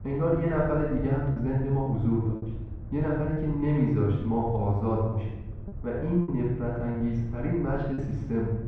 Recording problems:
room echo; strong; dies away in 0.9 s
off-mic speech; far
muffled; very; fading above 1.5 kHz
low rumble; faint; throughout; 20 dB below the speech
choppy; occasionally; 4% of the speech affected

